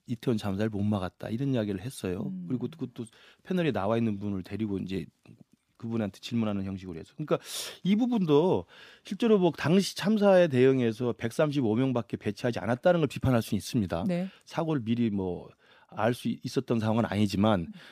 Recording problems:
none

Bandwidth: 15 kHz